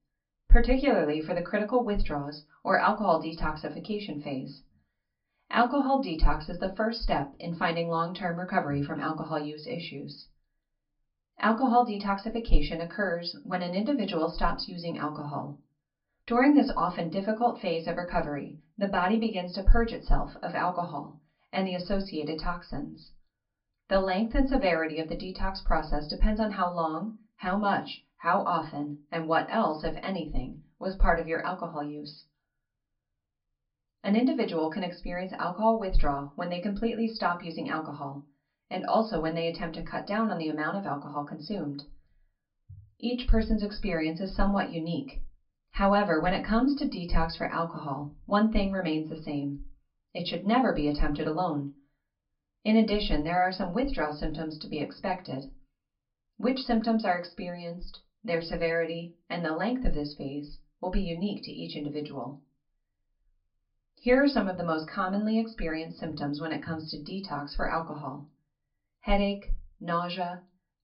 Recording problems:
off-mic speech; far
high frequencies cut off; noticeable; nothing above 5.5 kHz
room echo; very slight; dies away in 0.2 s

